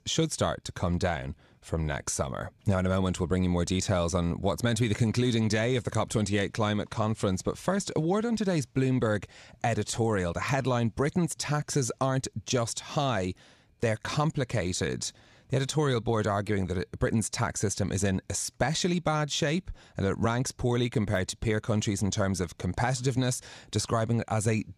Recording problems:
none

